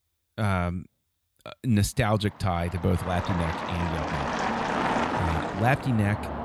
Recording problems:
traffic noise; loud; from 2.5 s on; 2 dB below the speech

